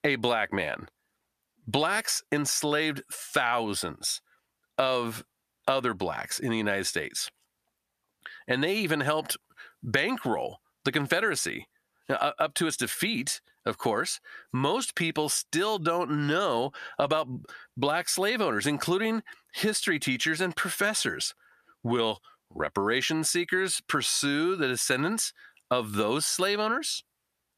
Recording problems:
squashed, flat; heavily

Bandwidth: 14.5 kHz